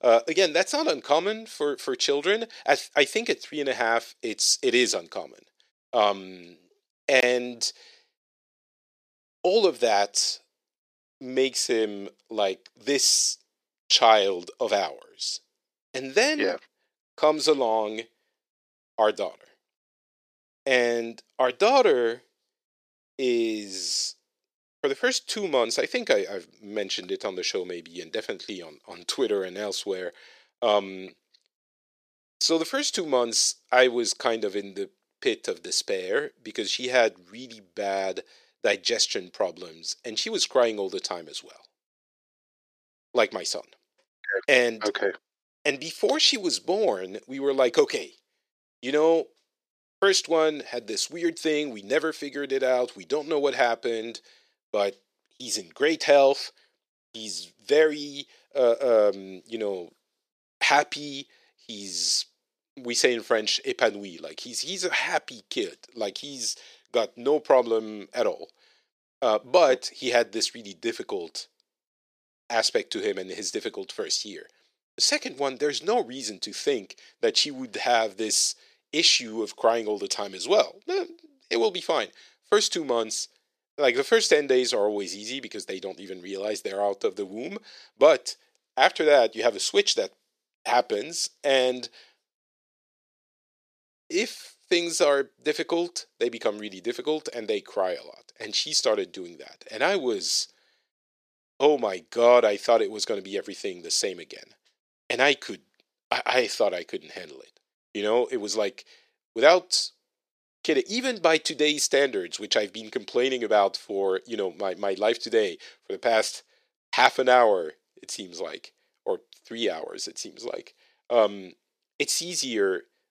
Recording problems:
thin; somewhat; fading below 350 Hz

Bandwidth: 14.5 kHz